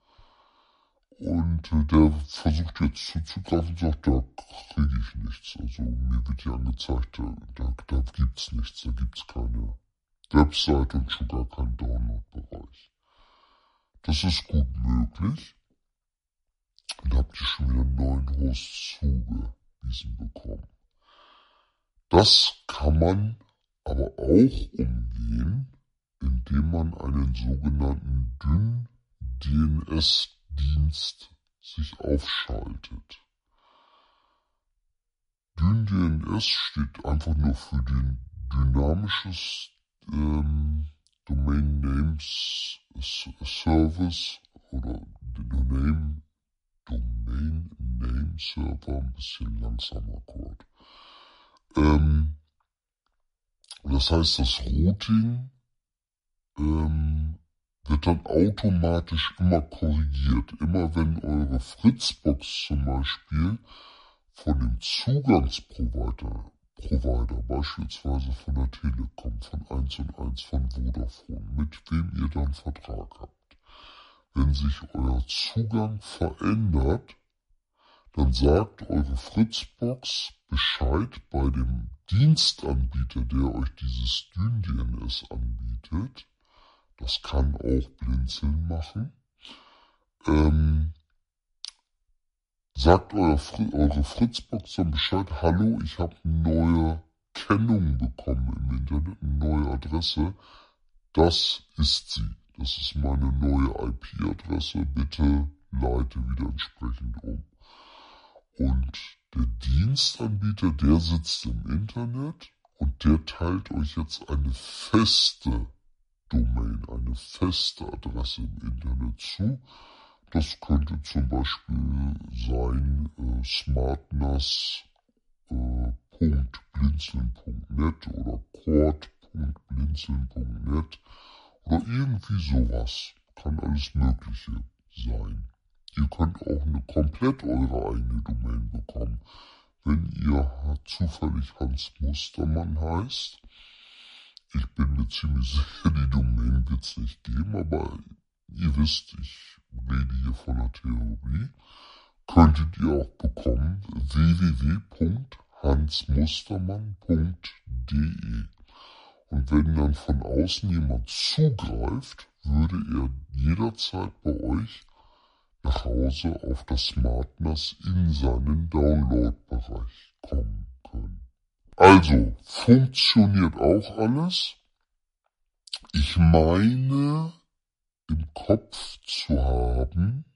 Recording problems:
wrong speed and pitch; too slow and too low; 0.7 times normal speed

